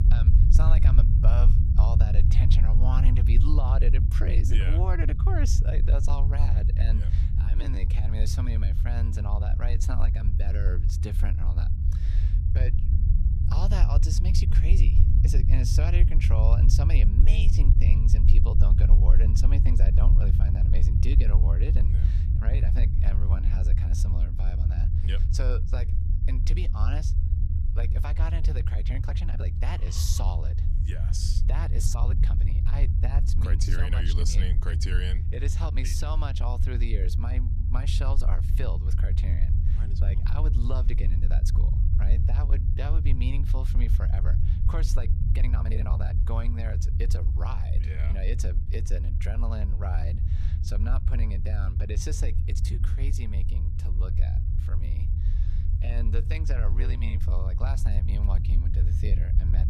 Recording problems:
low rumble; loud; throughout; 3 dB below the speech
uneven, jittery; strongly; from 7.5 to 57 s

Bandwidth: 14 kHz